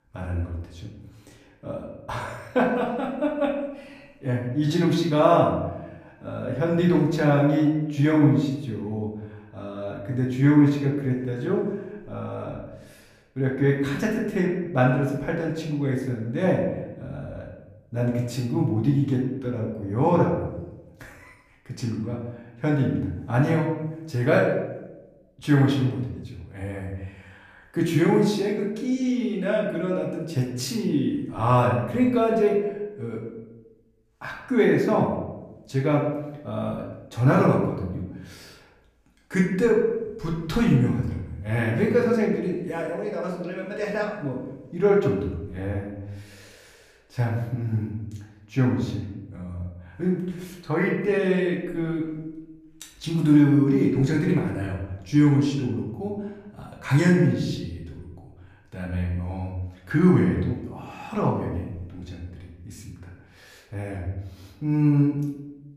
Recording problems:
off-mic speech; far
room echo; noticeable; dies away in 0.8 s

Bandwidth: 14.5 kHz